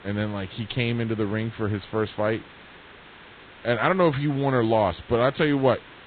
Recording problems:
garbled, watery; badly
high frequencies cut off; severe; nothing above 4 kHz
hiss; faint; throughout; 20 dB below the speech

